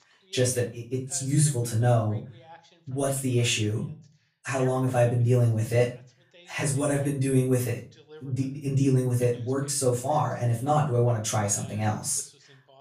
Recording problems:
off-mic speech; far
room echo; slight; dies away in 0.3 s
voice in the background; faint; throughout; 25 dB below the speech

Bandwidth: 14.5 kHz